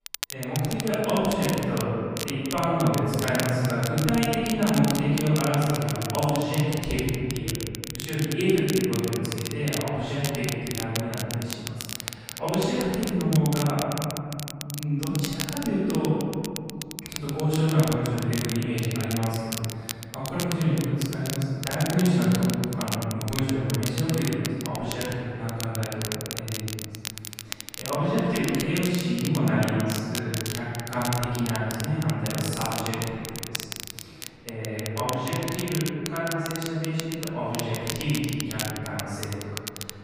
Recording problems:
room echo; strong; dies away in 2.4 s
off-mic speech; far
crackle, like an old record; loud; 8 dB below the speech

